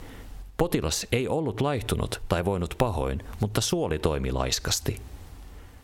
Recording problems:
squashed, flat; heavily

